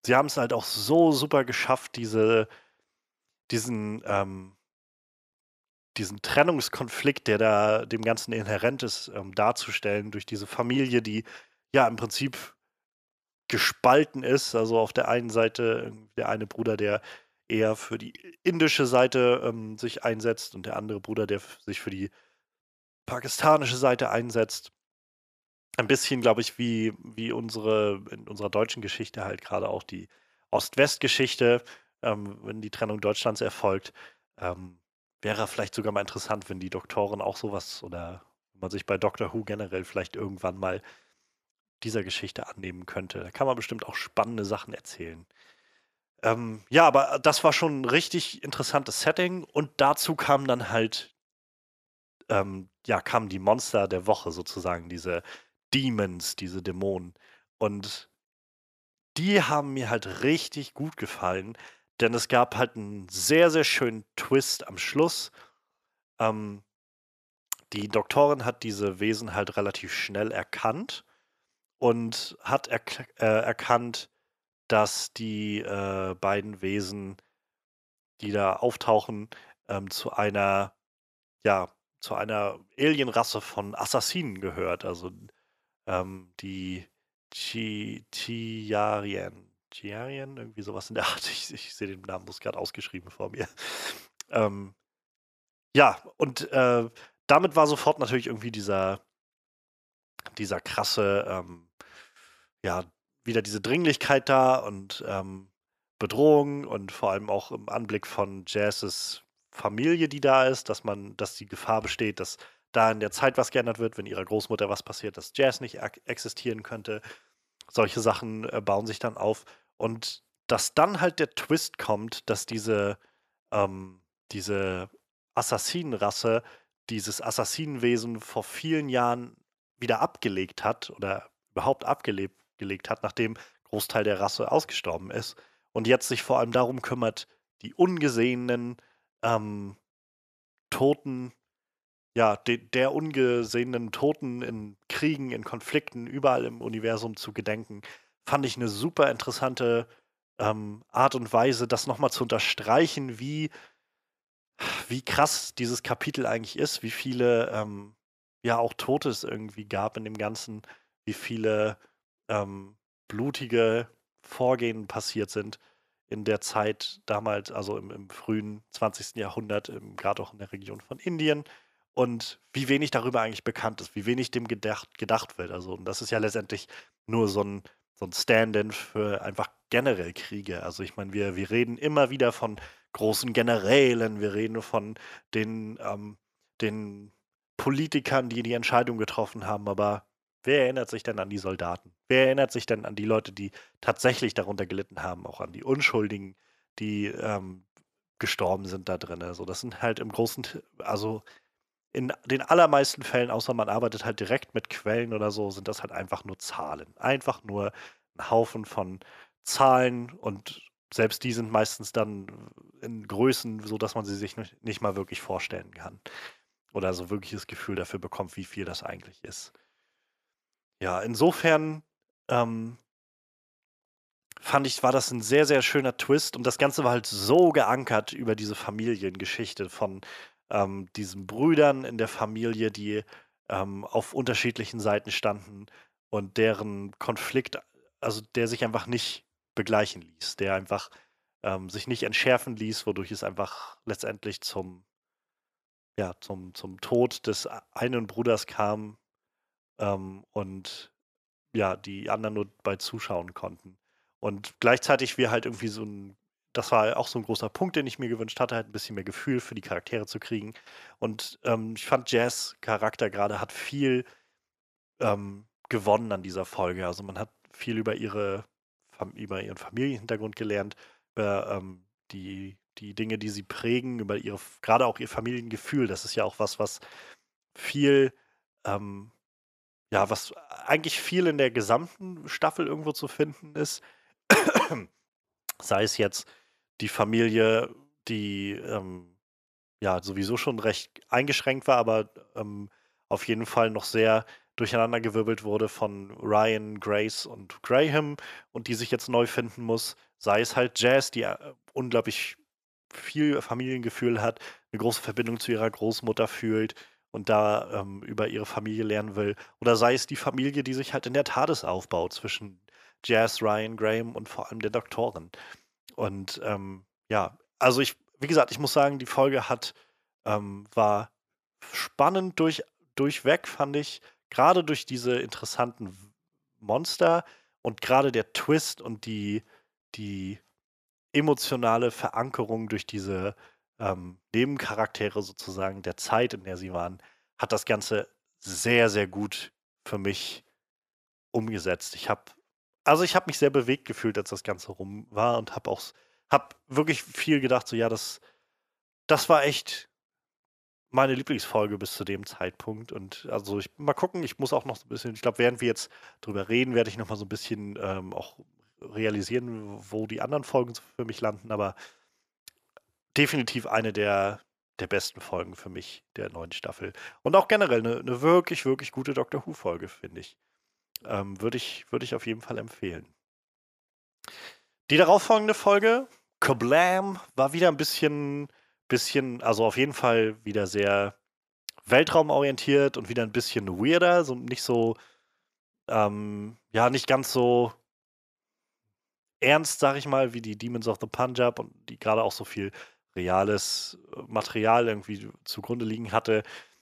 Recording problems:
none

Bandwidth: 14.5 kHz